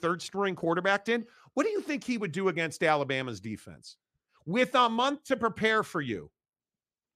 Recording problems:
none

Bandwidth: 15 kHz